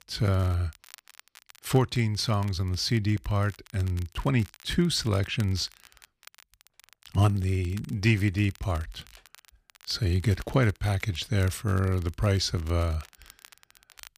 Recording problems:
crackle, like an old record; faint; 25 dB below the speech

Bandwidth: 15 kHz